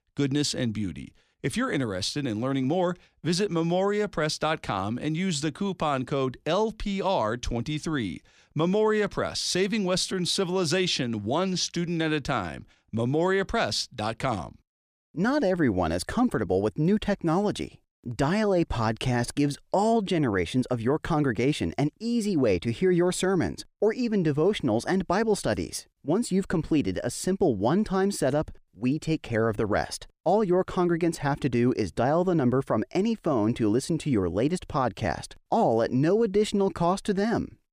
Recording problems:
none

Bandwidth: 15 kHz